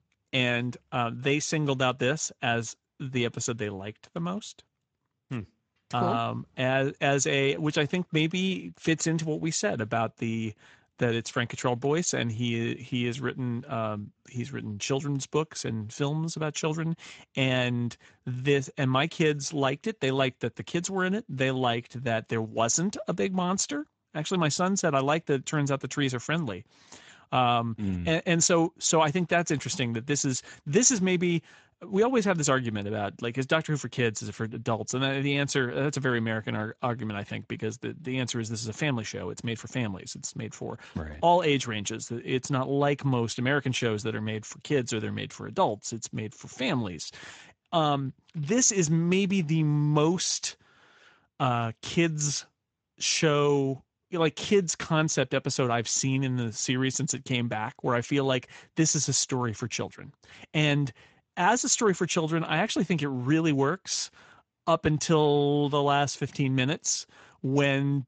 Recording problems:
garbled, watery; slightly; nothing above 7.5 kHz

